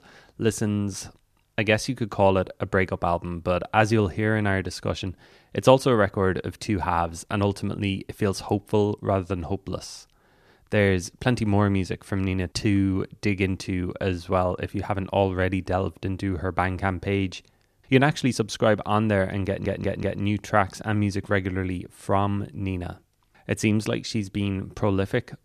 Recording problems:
audio stuttering; at 19 s

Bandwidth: 14.5 kHz